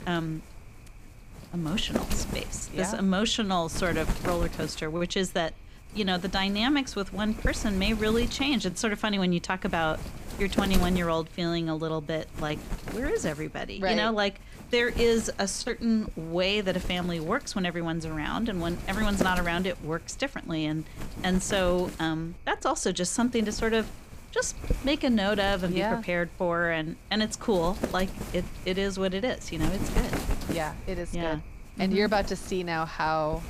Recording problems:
wind noise on the microphone; occasional gusts; 10 dB below the speech

